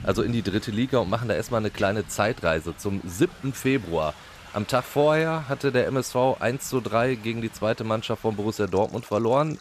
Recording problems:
rain or running water; noticeable; throughout; 20 dB below the speech

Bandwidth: 14.5 kHz